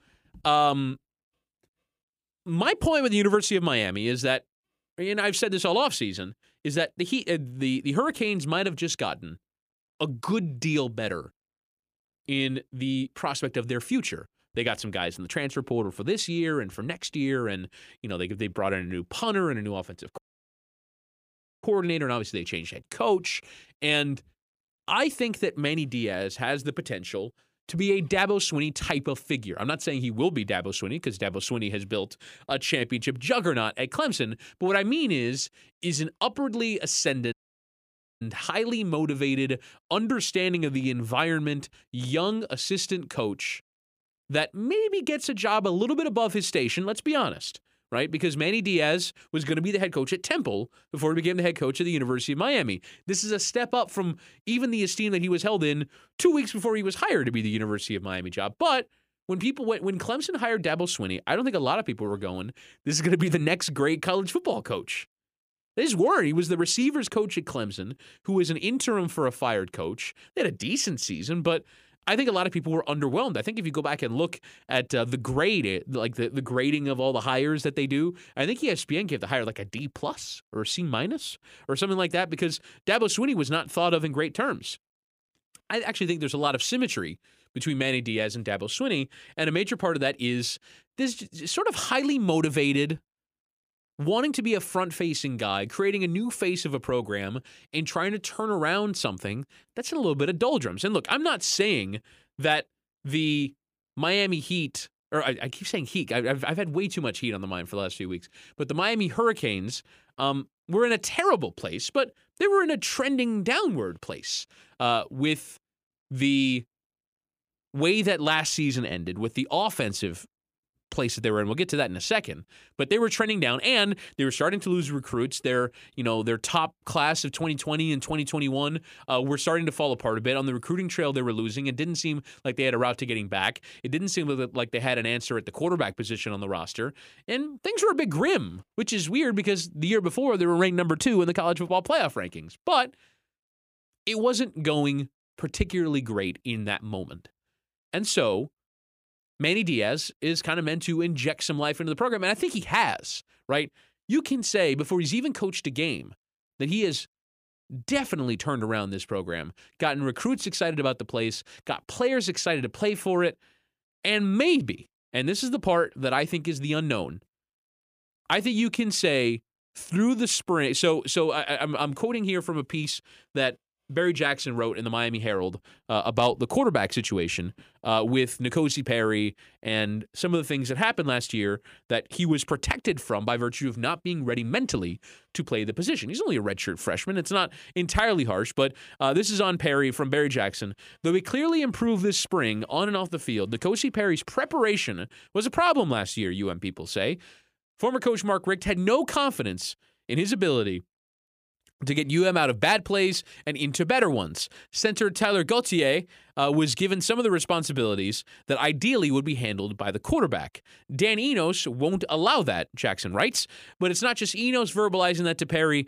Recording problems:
audio cutting out; at 20 s for 1.5 s and at 37 s for 1 s

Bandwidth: 15 kHz